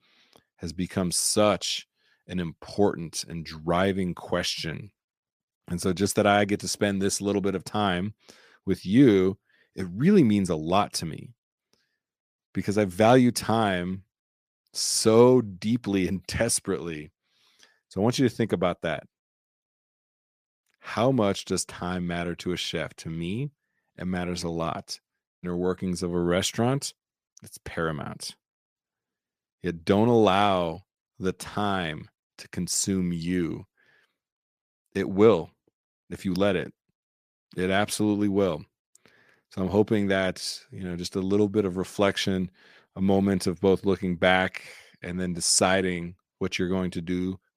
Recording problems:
none

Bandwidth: 15 kHz